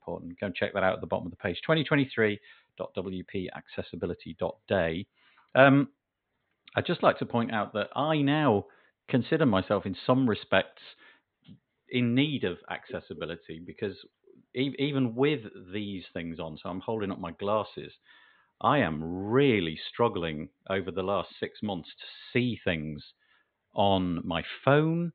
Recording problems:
high frequencies cut off; severe; nothing above 4 kHz

